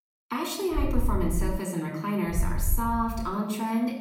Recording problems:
off-mic speech; far
room echo; noticeable; dies away in 0.8 s
low rumble; faint; at 1 s and at 2.5 s; 20 dB below the speech

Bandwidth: 16 kHz